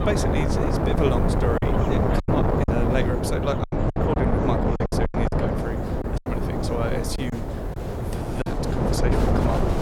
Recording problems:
wind noise on the microphone; heavy; 3 dB above the speech
animal sounds; noticeable; throughout; 15 dB below the speech
murmuring crowd; noticeable; throughout; 15 dB below the speech
hiss; faint; until 3.5 s and from 5.5 to 8 s; 25 dB below the speech
choppy; very; 9% of the speech affected

